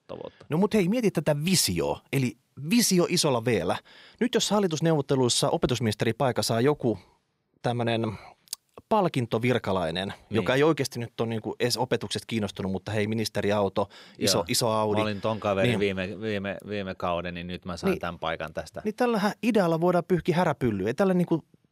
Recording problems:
none

